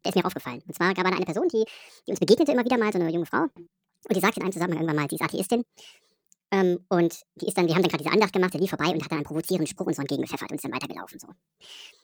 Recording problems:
wrong speed and pitch; too fast and too high; 1.6 times normal speed

